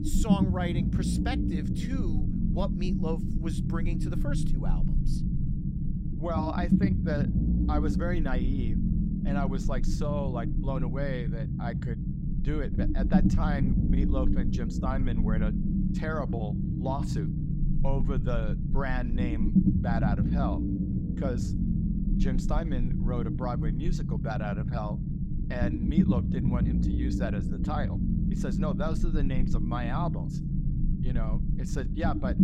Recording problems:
low rumble; loud; throughout; 1 dB below the speech

